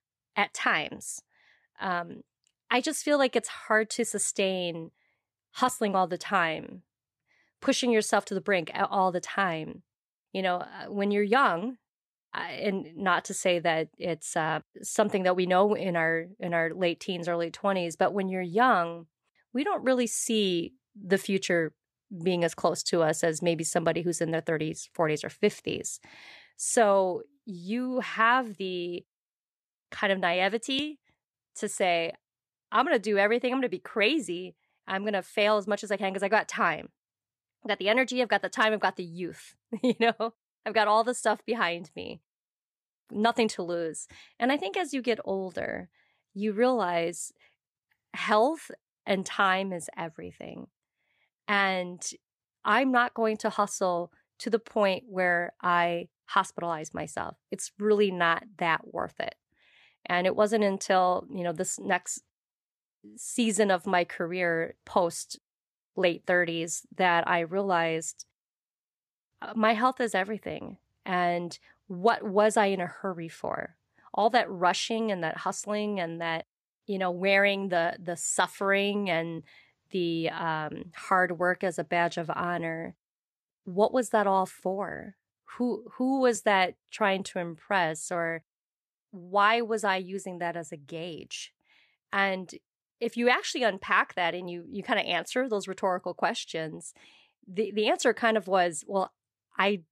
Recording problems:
none

